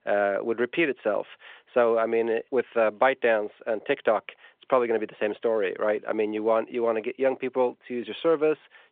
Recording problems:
phone-call audio

